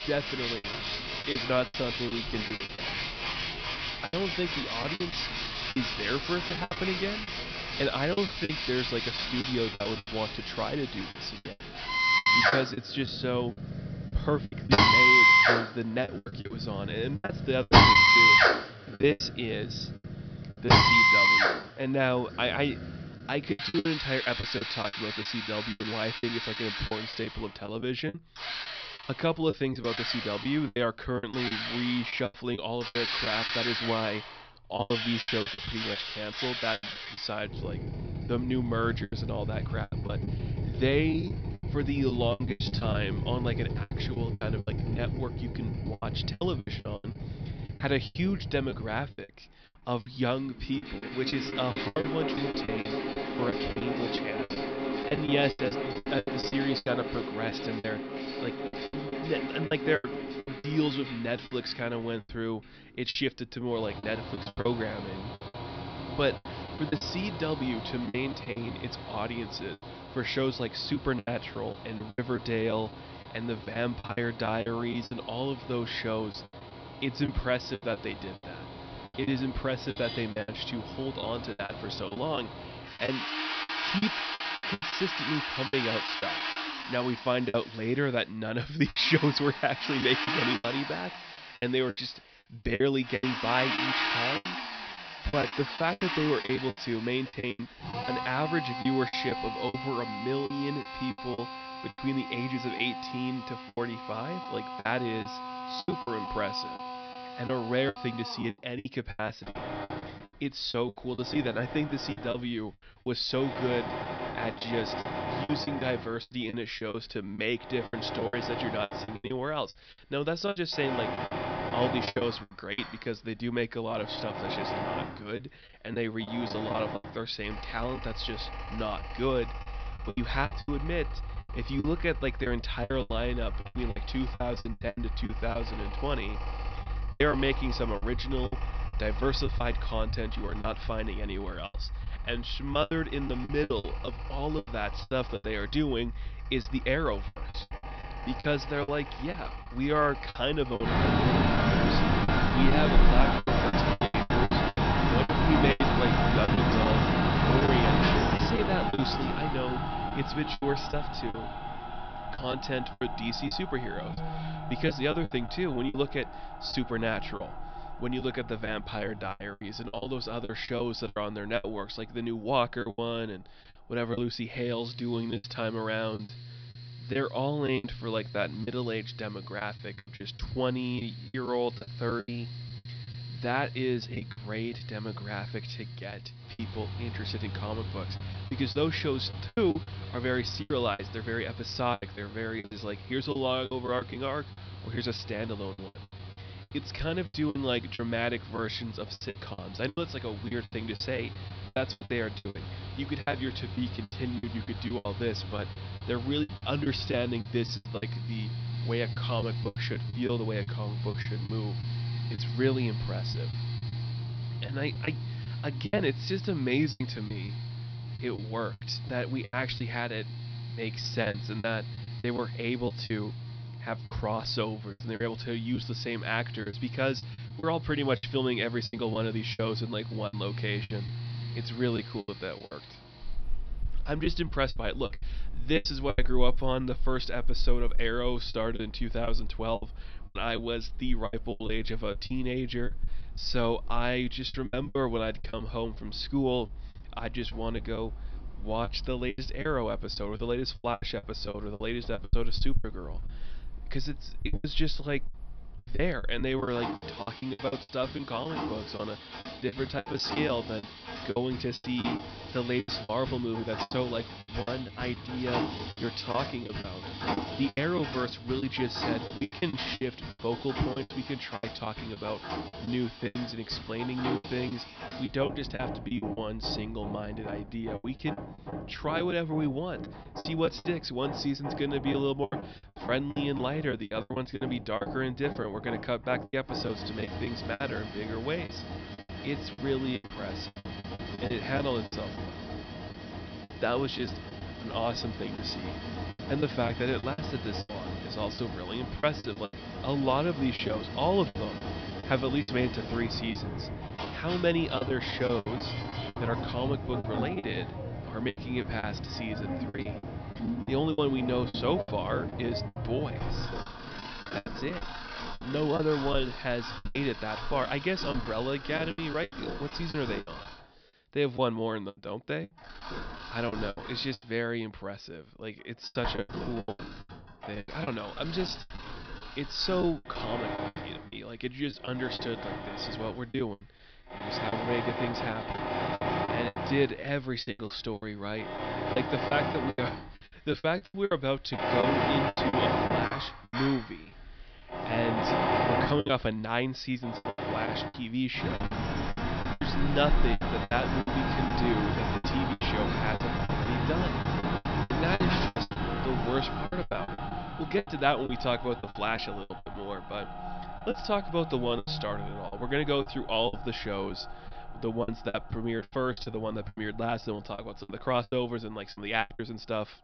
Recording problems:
high frequencies cut off; noticeable; nothing above 5.5 kHz
machinery noise; very loud; throughout; as loud as the speech
choppy; very; 11% of the speech affected

